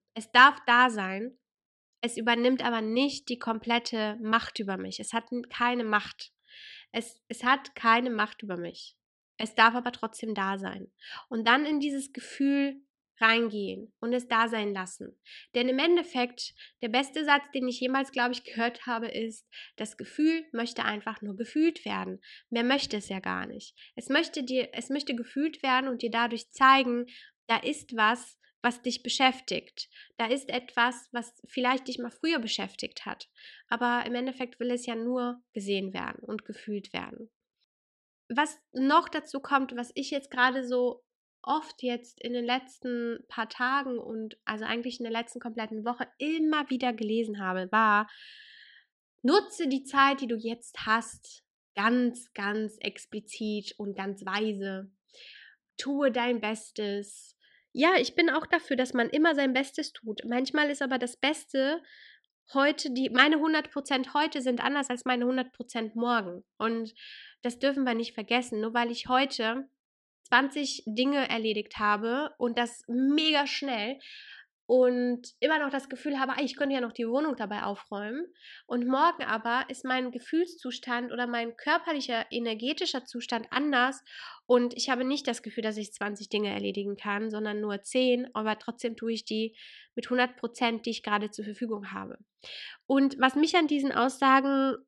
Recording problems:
muffled; slightly; fading above 3.5 kHz

